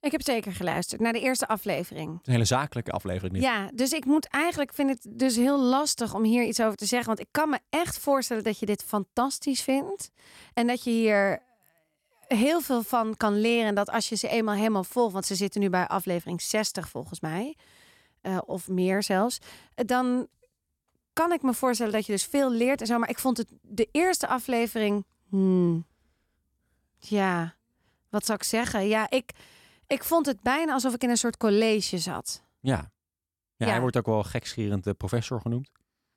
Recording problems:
none

